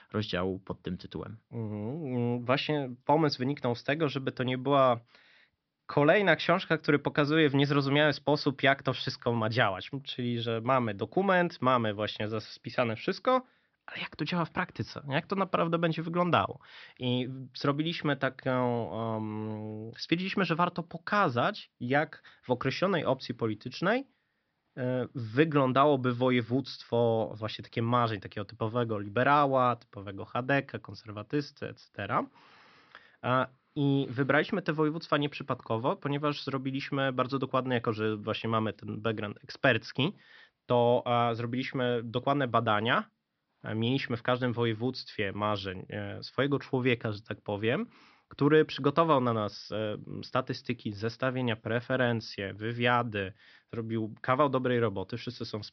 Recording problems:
high frequencies cut off; noticeable; nothing above 5.5 kHz

